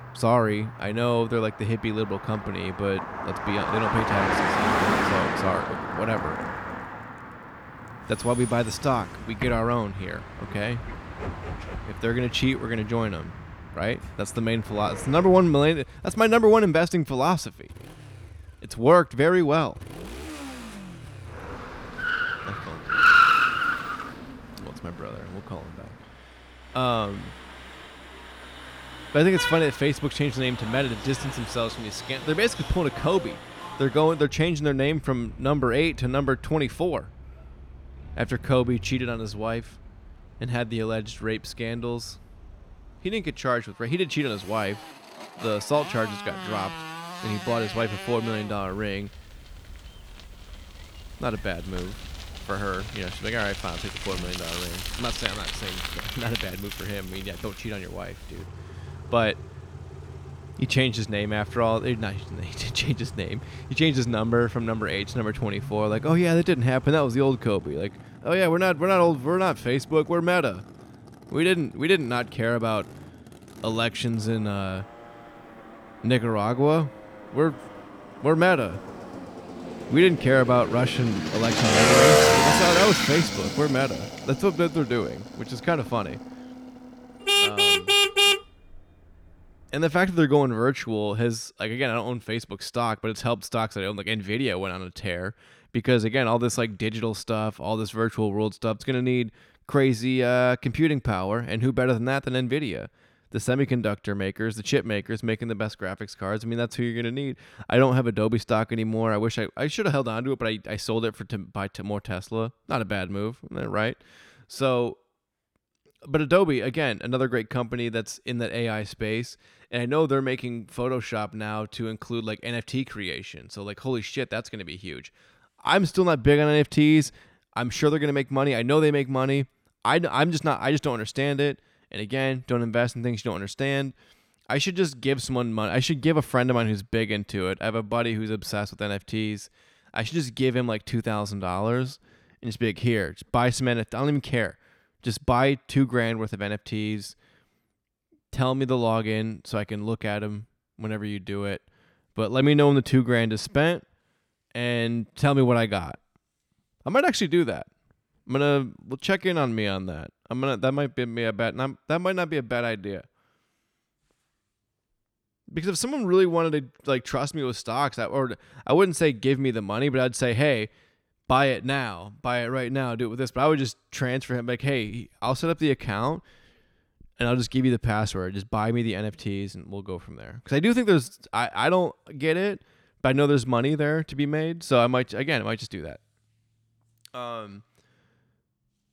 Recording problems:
traffic noise; loud; until 1:30; 1 dB below the speech

